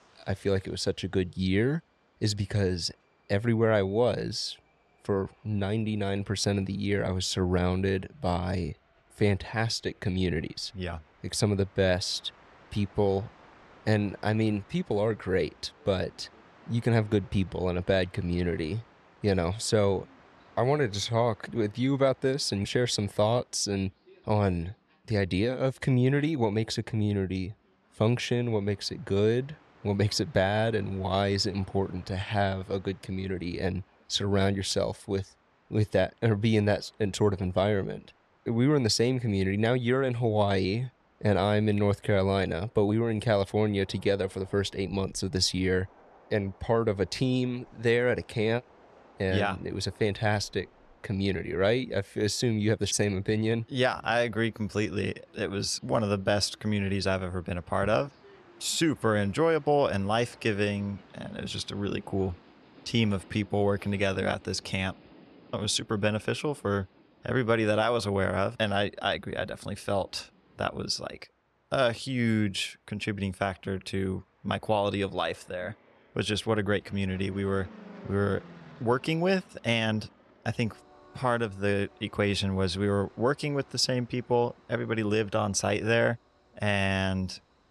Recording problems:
train or aircraft noise; faint; throughout; 30 dB below the speech

